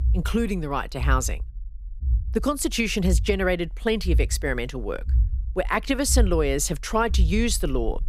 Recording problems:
low rumble; faint; throughout; 20 dB below the speech

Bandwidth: 15.5 kHz